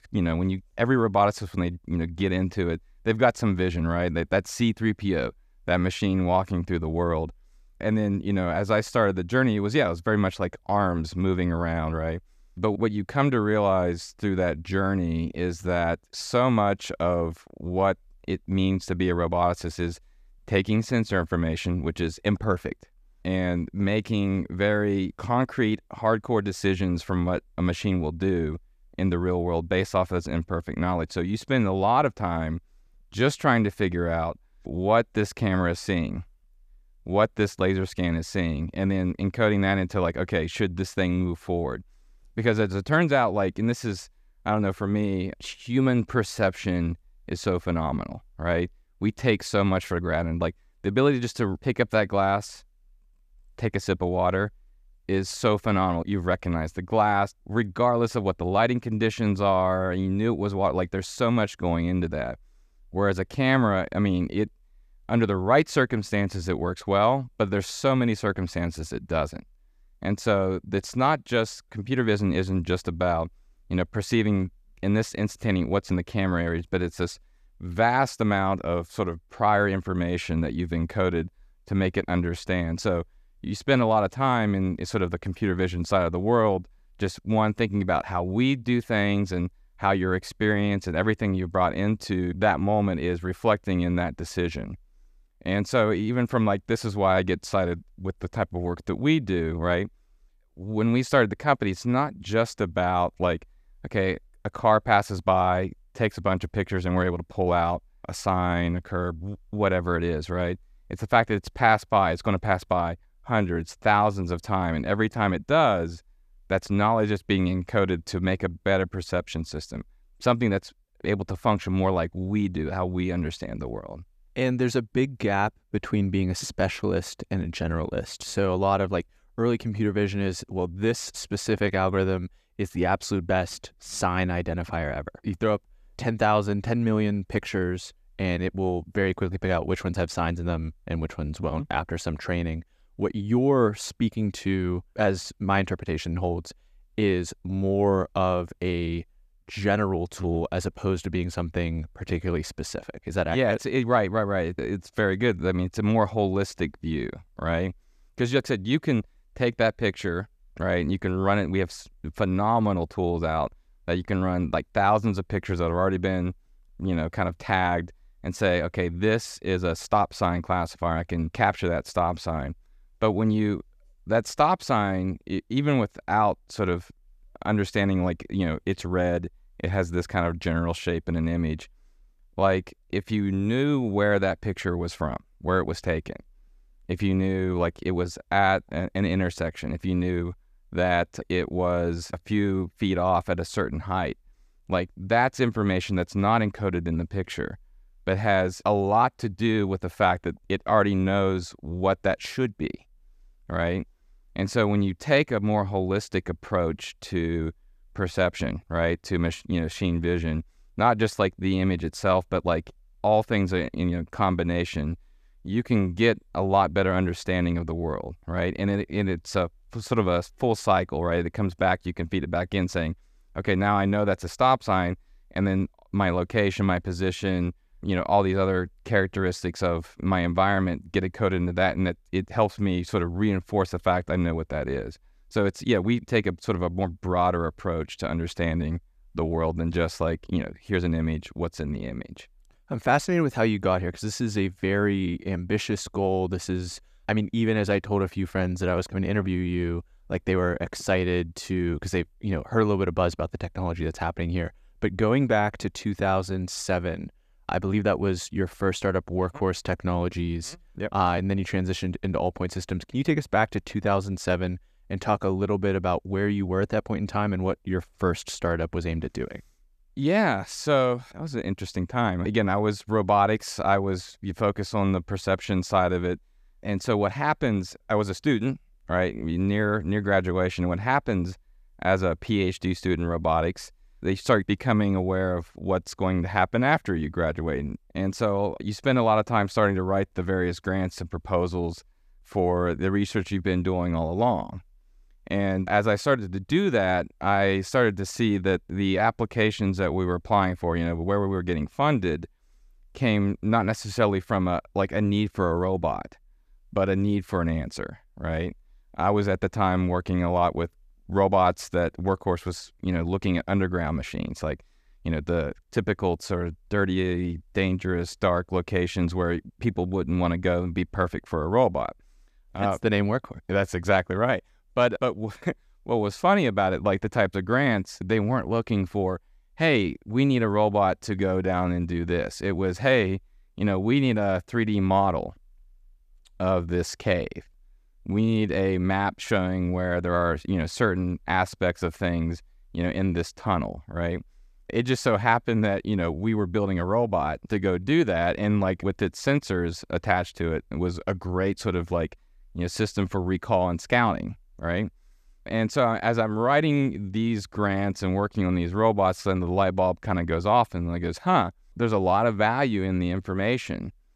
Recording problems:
none

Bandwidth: 14.5 kHz